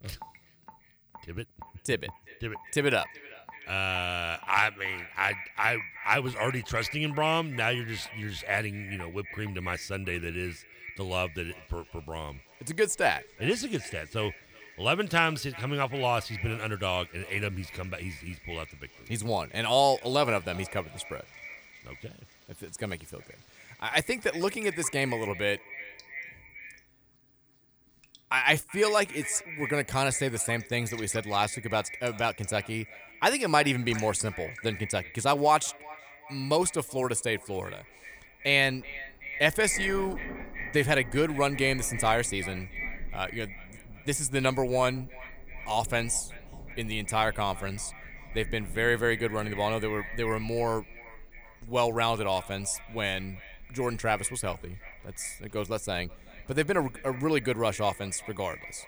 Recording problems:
echo of what is said; noticeable; throughout; 380 ms later, 15 dB below the speech
rain or running water; faint; throughout; 25 dB below the speech

